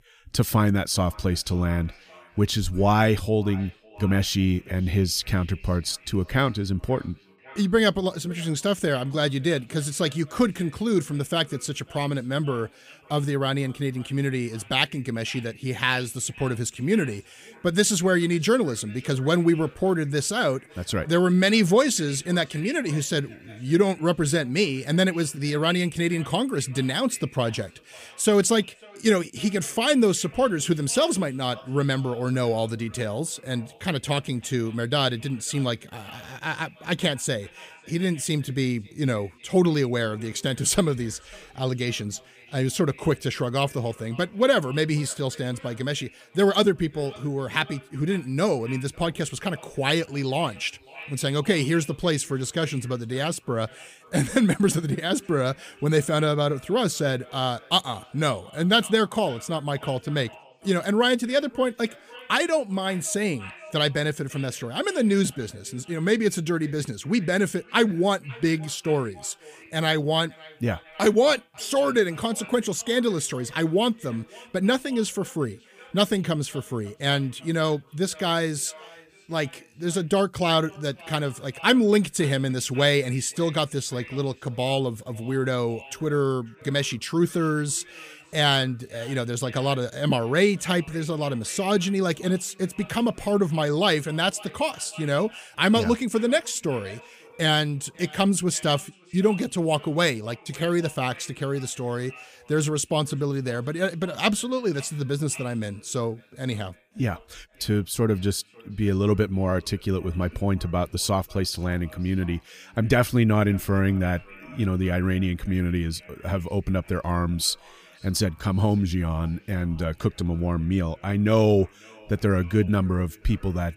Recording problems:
echo of what is said; faint; throughout; 550 ms later, 20 dB below the speech

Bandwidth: 15 kHz